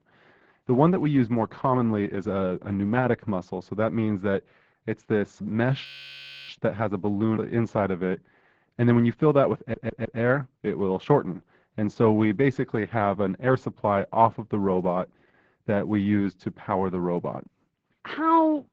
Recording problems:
garbled, watery; badly
muffled; slightly; fading above 2 kHz
audio freezing; at 6 s for 0.5 s
audio stuttering; at 9.5 s

